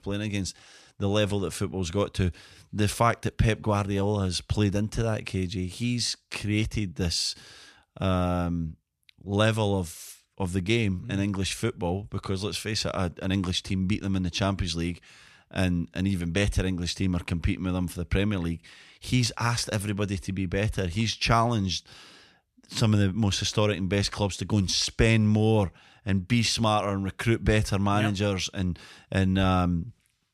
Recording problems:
none

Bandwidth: 14 kHz